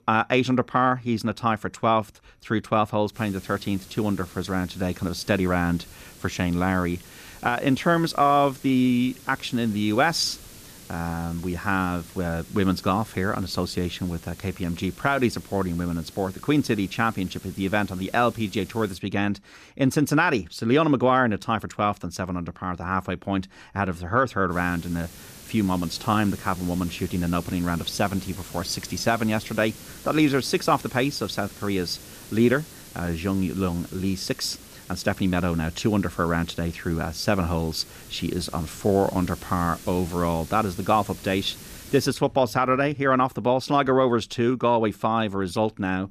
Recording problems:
hiss; noticeable; from 3 to 19 s and from 25 to 42 s; 20 dB below the speech

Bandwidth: 14.5 kHz